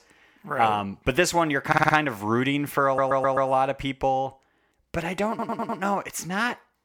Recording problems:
audio stuttering; at 1.5 s, at 3 s and at 5.5 s

